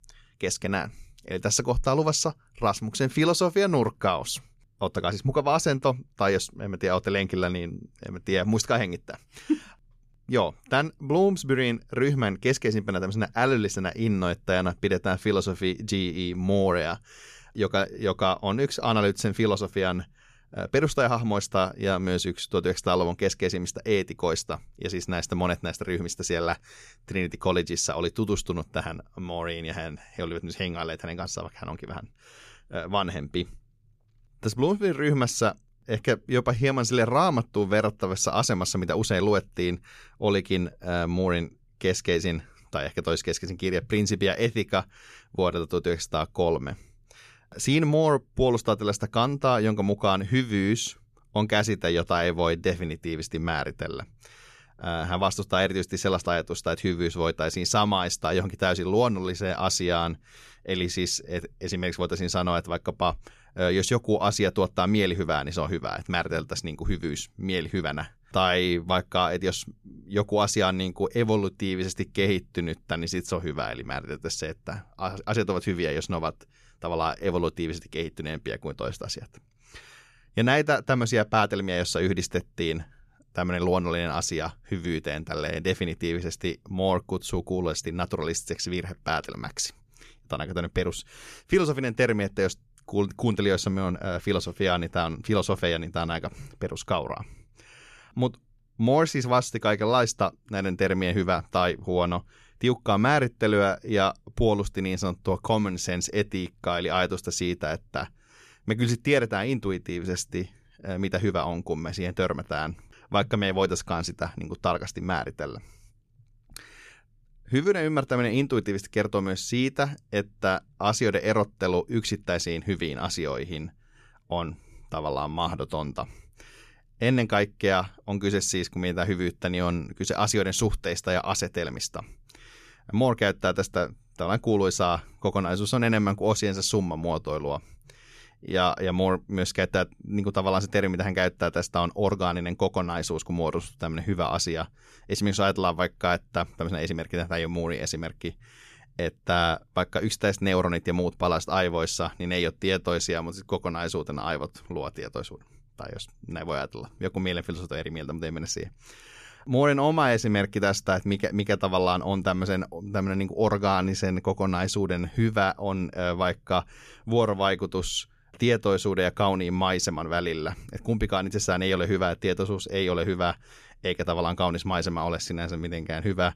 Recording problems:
none

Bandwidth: 14.5 kHz